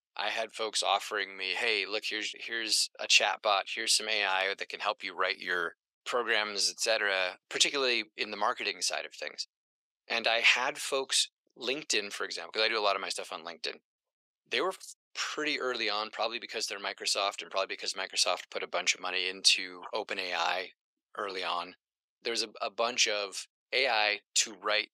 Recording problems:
thin; very; fading below 500 Hz

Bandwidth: 15.5 kHz